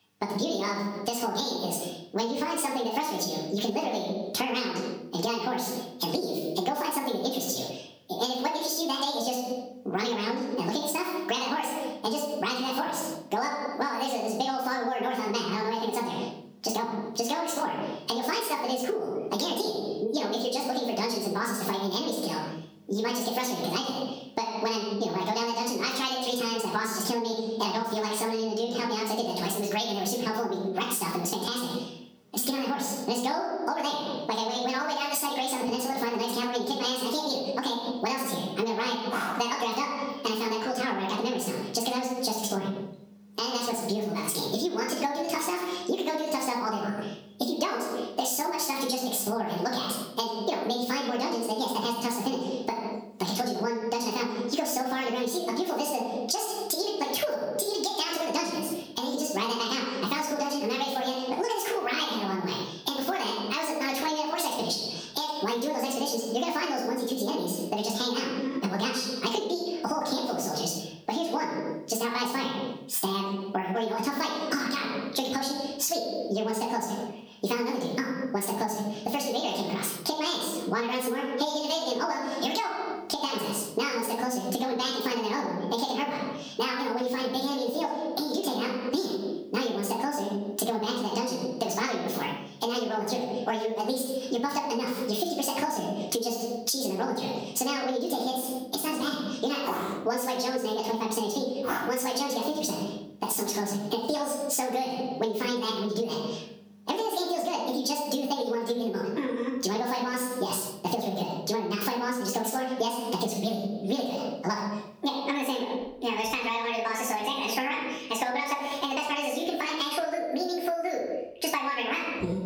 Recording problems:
off-mic speech; far
wrong speed and pitch; too fast and too high; 1.7 times normal speed
room echo; noticeable; dies away in 0.6 s
squashed, flat; somewhat

